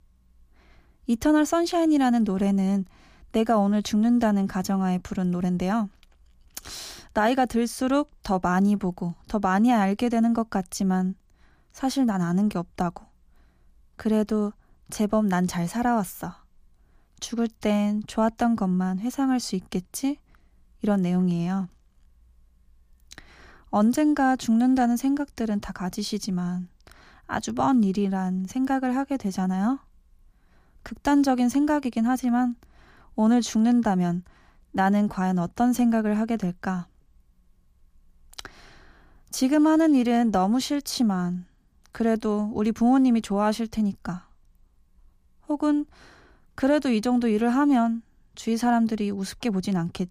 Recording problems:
none

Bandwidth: 15 kHz